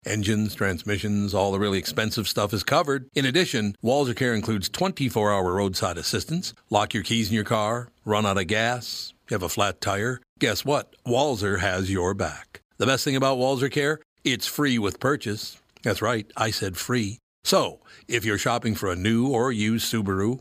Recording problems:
none

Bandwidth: 15 kHz